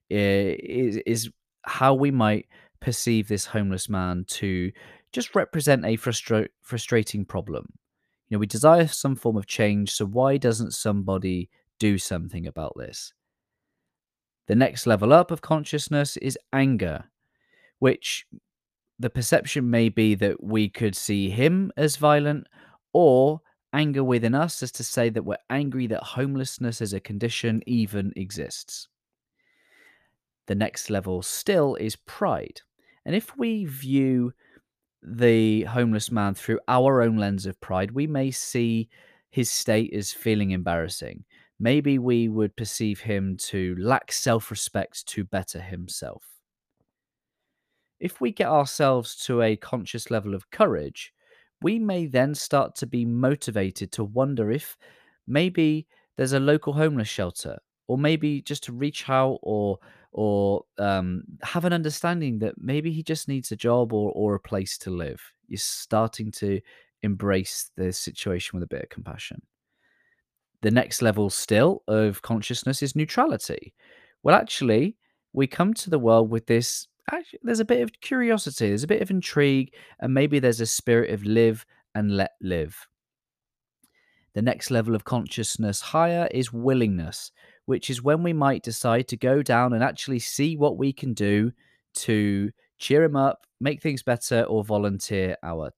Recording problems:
none

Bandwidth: 14.5 kHz